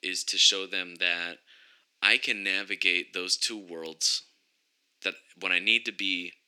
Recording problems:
thin; very; fading below 300 Hz

